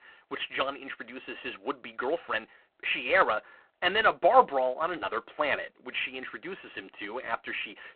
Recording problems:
phone-call audio; poor line

